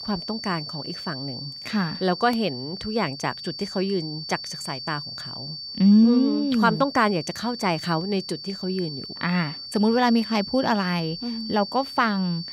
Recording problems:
high-pitched whine; loud; throughout; 4.5 kHz, 9 dB below the speech

